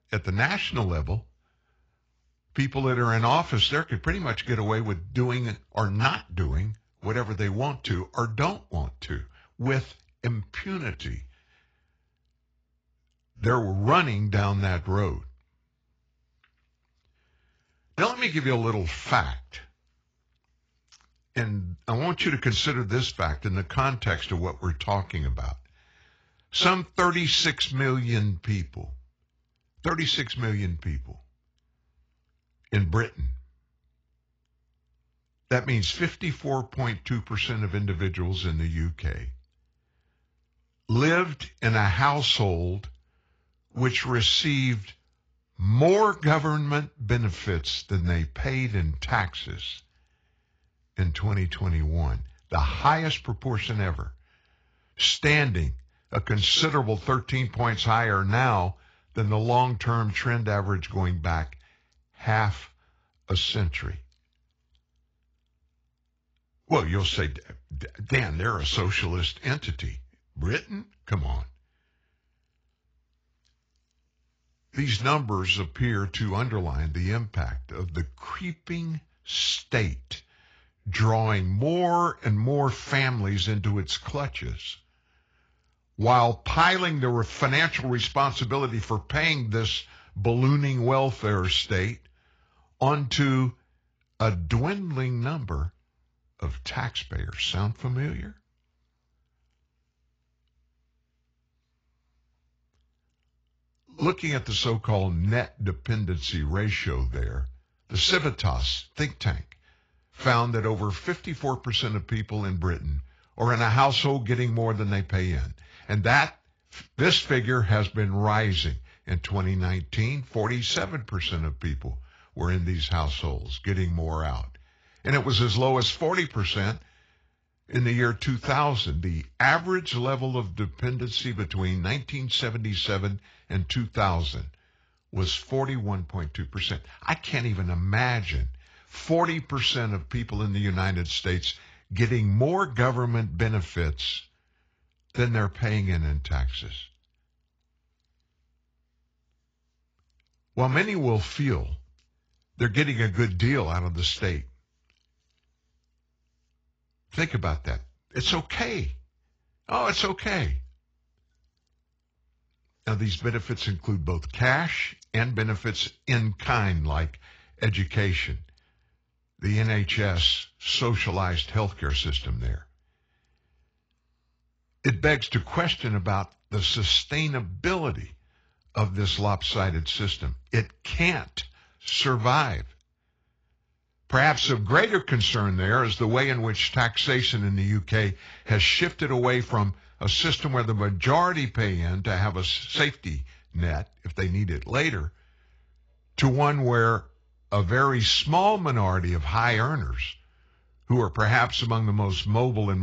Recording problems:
garbled, watery; badly
abrupt cut into speech; at the end

